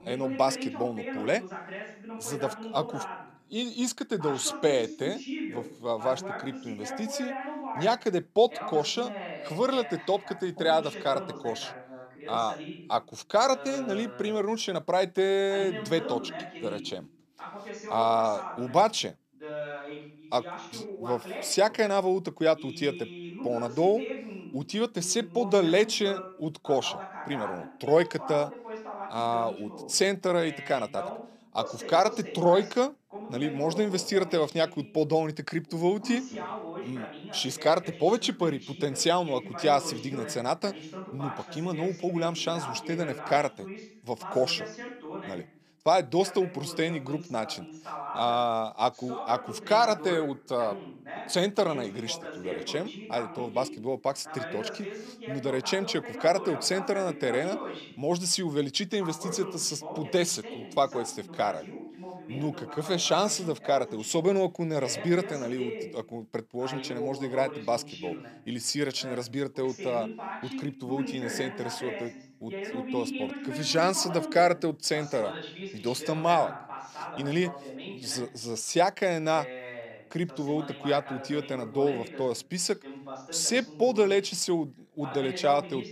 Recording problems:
voice in the background; noticeable; throughout; 10 dB below the speech

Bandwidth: 14.5 kHz